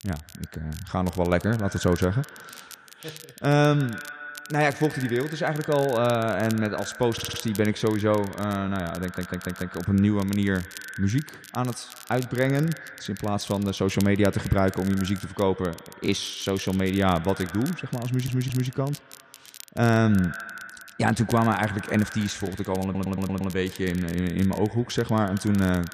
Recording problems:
echo of what is said; noticeable; throughout; 130 ms later, 15 dB below the speech
crackle, like an old record; noticeable; 20 dB below the speech
audio stuttering; 4 times, first at 7 s

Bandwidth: 14.5 kHz